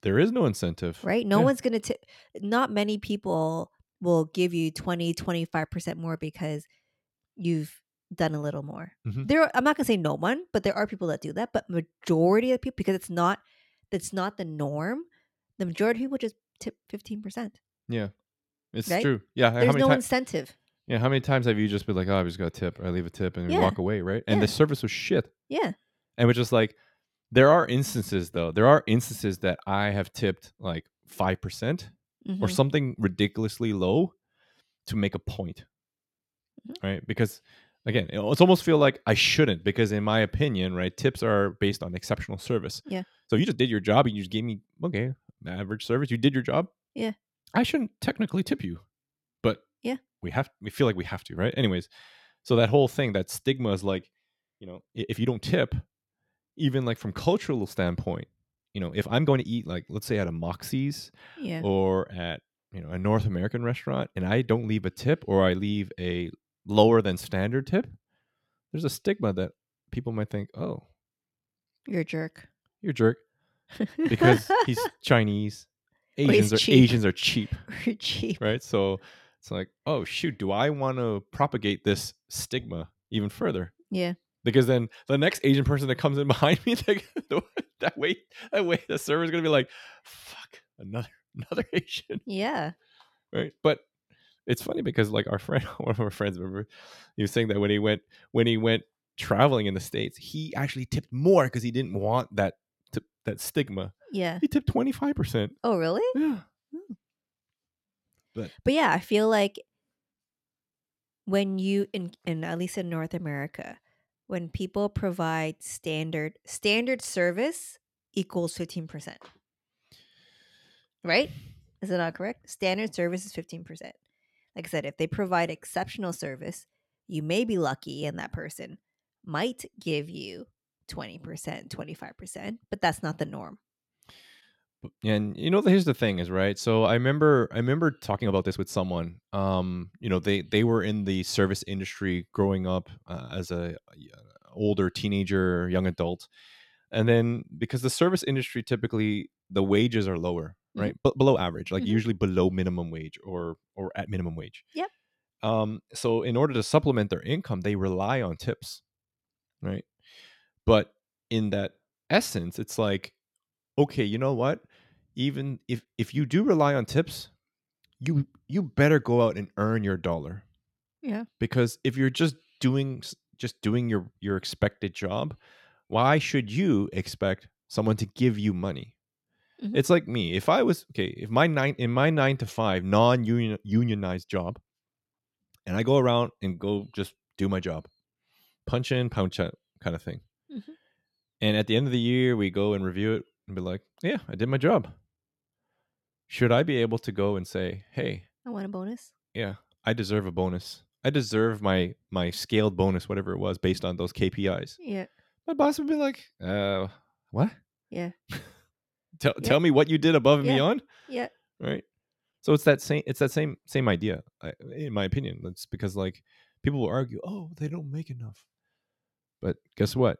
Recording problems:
uneven, jittery; strongly; from 15 s to 3:38

